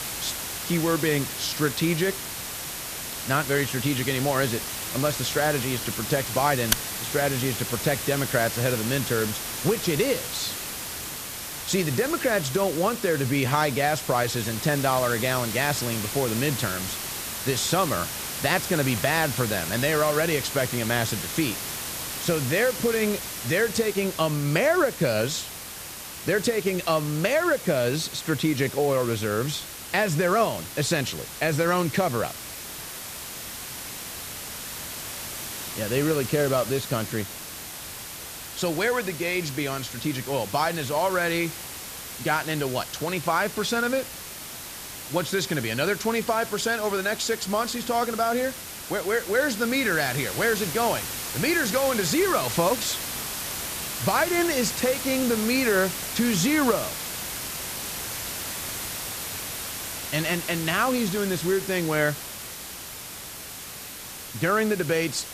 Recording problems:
hiss; loud; throughout; 6 dB below the speech

